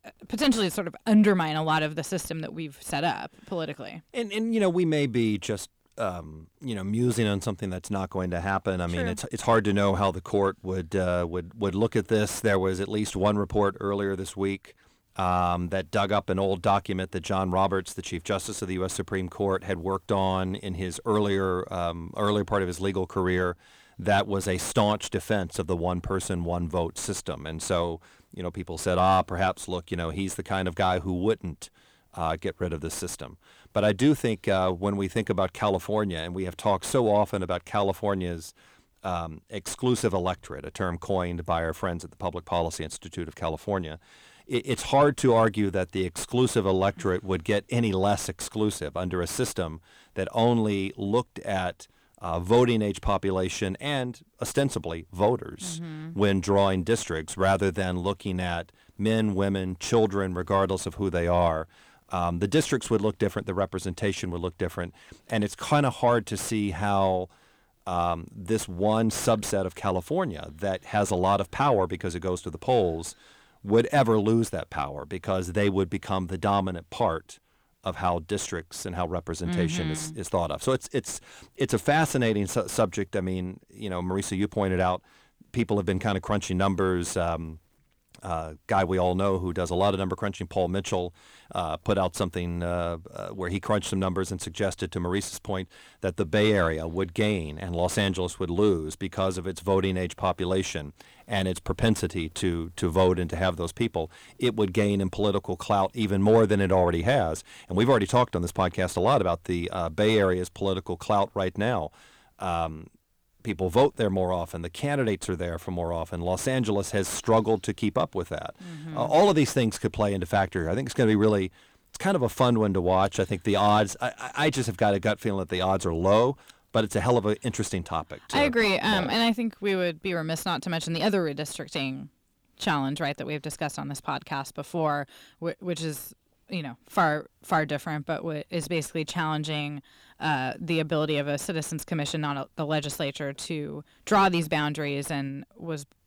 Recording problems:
distortion; slight; 10 dB below the speech

